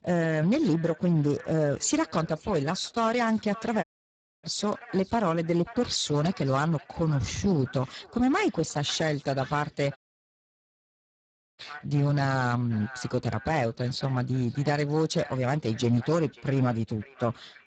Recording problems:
garbled, watery; badly; nothing above 7.5 kHz
echo of what is said; faint; throughout; 540 ms later, 20 dB below the speech
distortion; slight; 10 dB below the speech
audio cutting out; at 4 s for 0.5 s and at 10 s for 1.5 s

